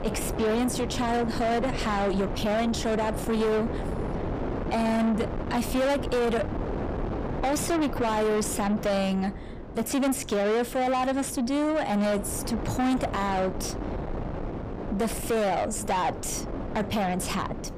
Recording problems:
distortion; heavy; 8 dB below the speech
wind noise on the microphone; heavy; 9 dB below the speech

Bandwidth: 15 kHz